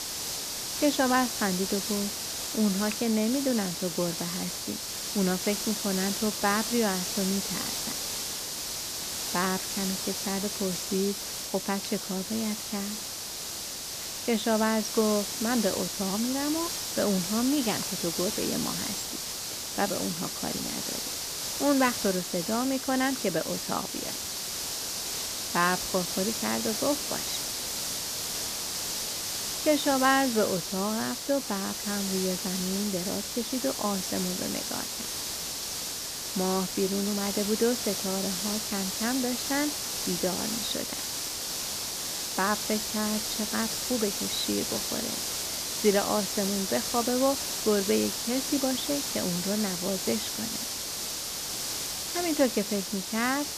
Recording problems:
high frequencies cut off; slight; nothing above 8 kHz
hiss; loud; throughout; 1 dB below the speech

